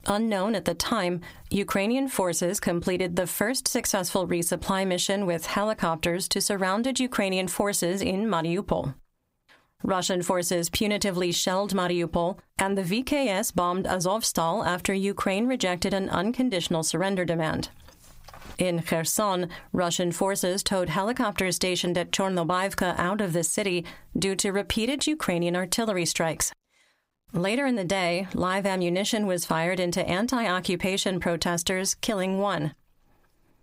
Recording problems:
squashed, flat; somewhat

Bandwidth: 15.5 kHz